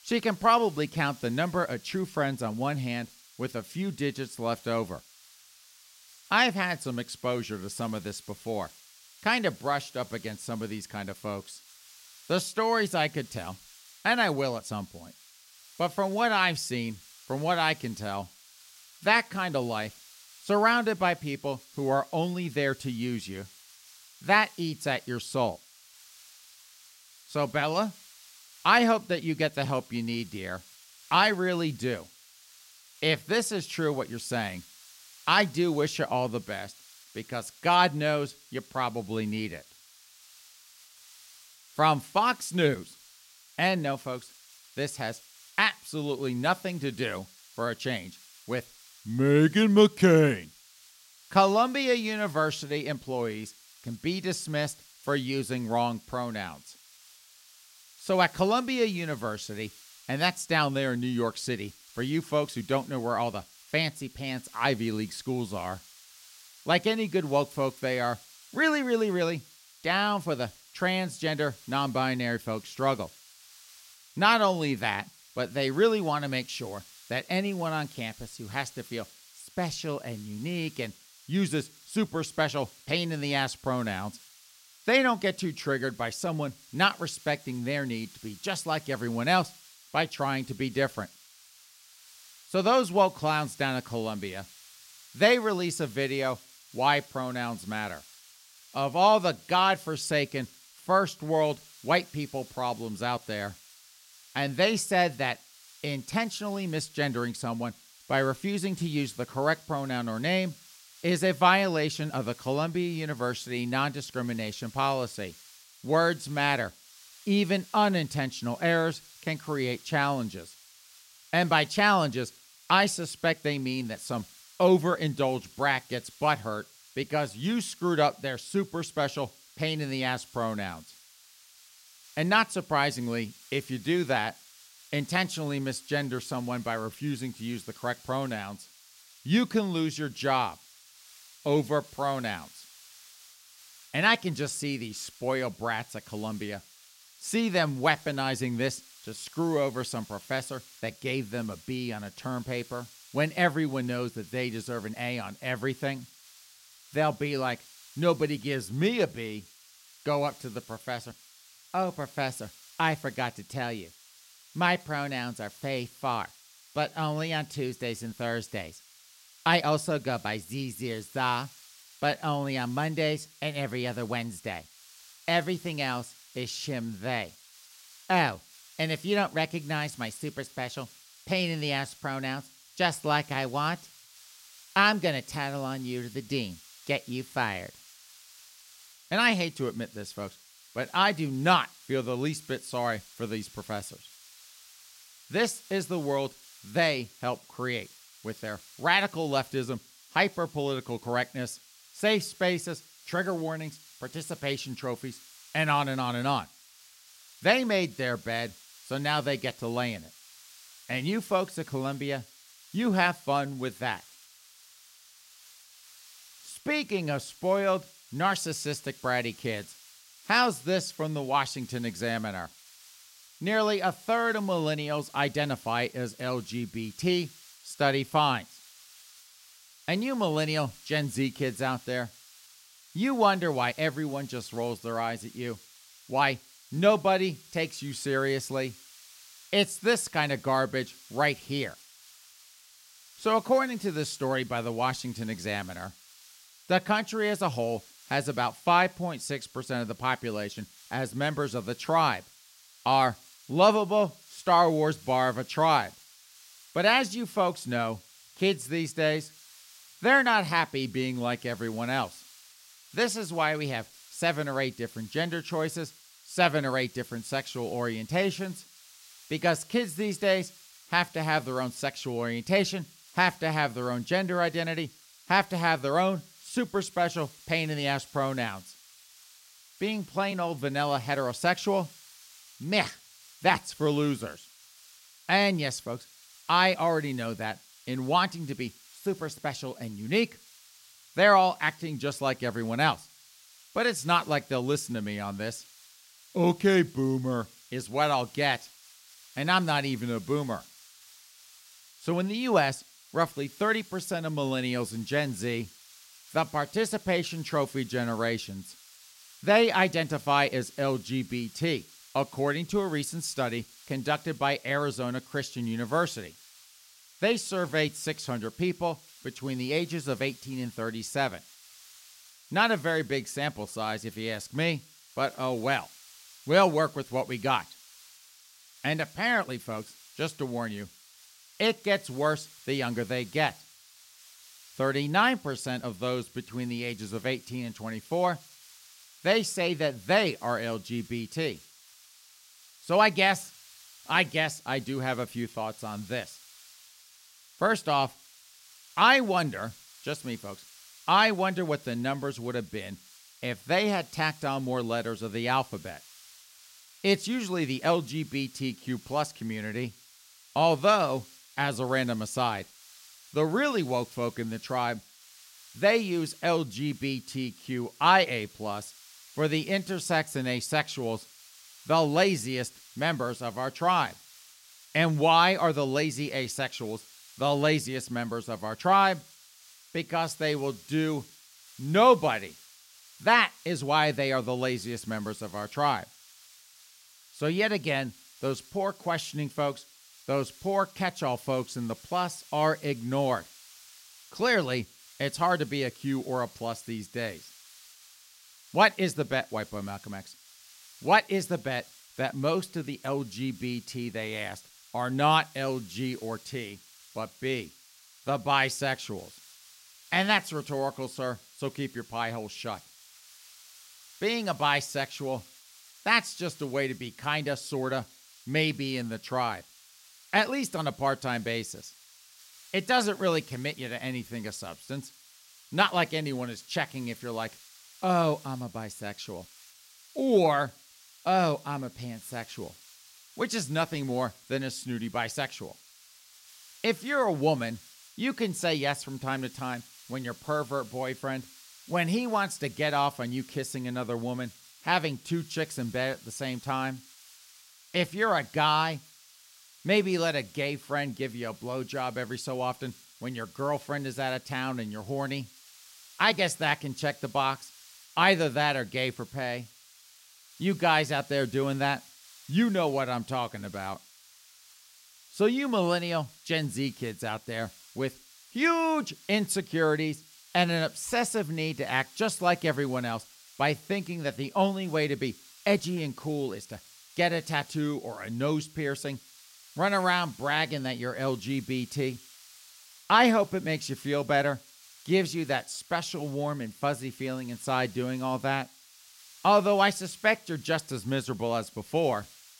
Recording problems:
hiss; faint; throughout; 20 dB below the speech

